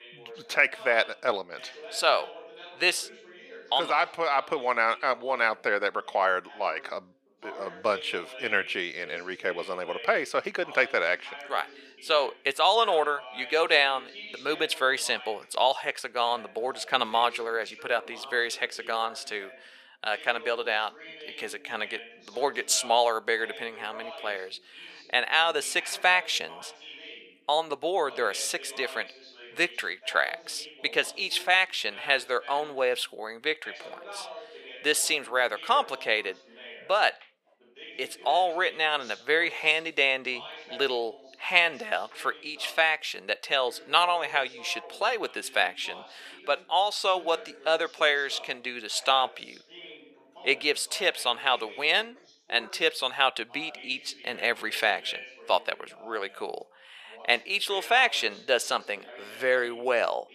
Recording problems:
thin; very; fading below 550 Hz
voice in the background; noticeable; throughout; 20 dB below the speech

